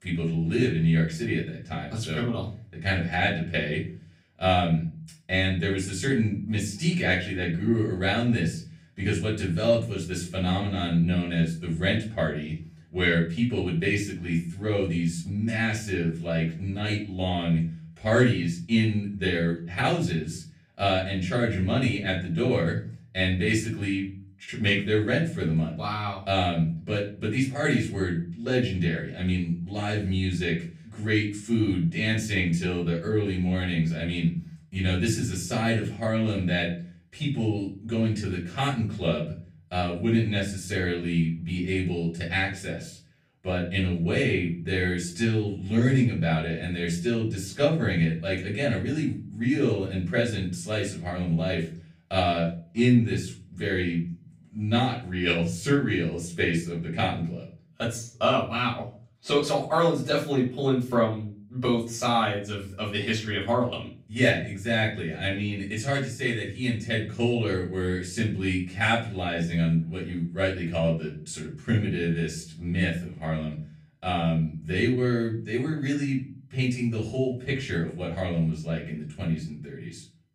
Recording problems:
off-mic speech; far
room echo; slight; dies away in 0.4 s

